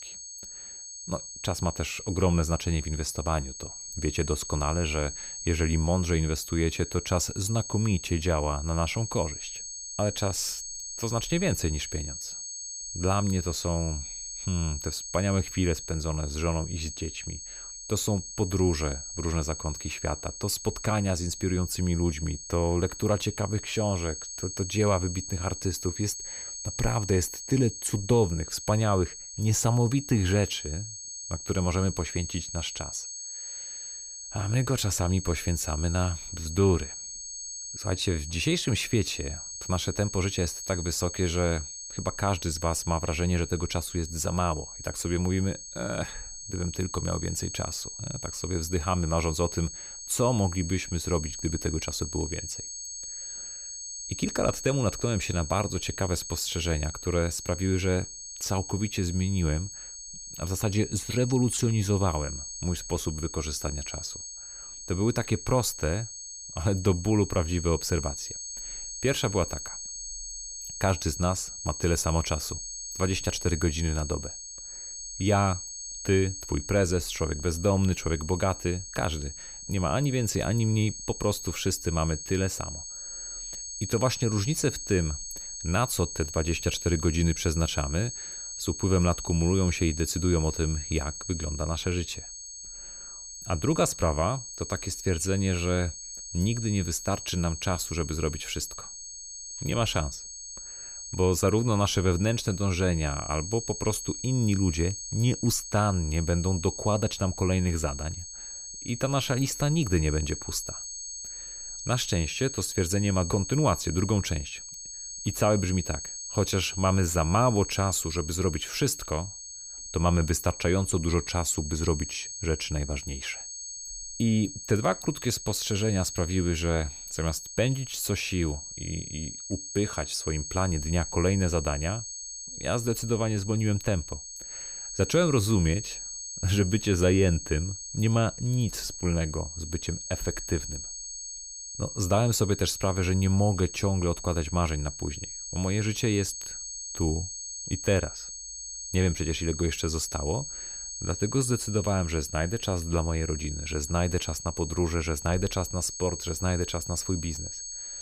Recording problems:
high-pitched whine; loud; throughout; 6.5 kHz, 8 dB below the speech

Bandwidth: 15 kHz